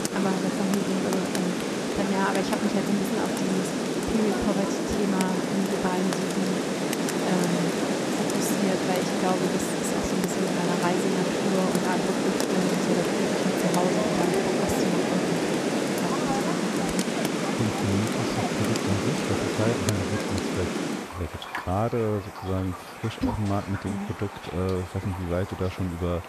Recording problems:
rain or running water; very loud; throughout; 3 dB above the speech

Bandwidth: 13.5 kHz